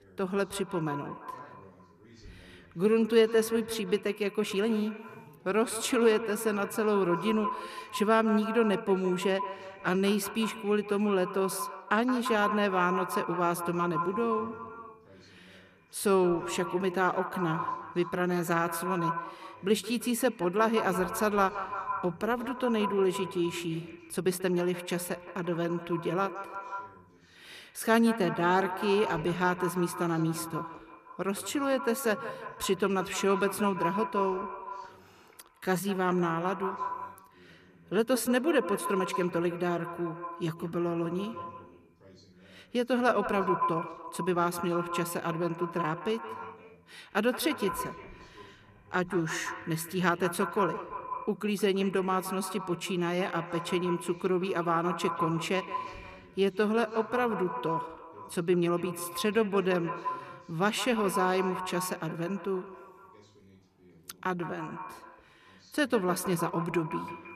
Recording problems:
echo of what is said; strong; throughout; 170 ms later, 8 dB below the speech
voice in the background; faint; throughout; 30 dB below the speech
uneven, jittery; strongly; from 2.5 s to 1:07

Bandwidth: 14.5 kHz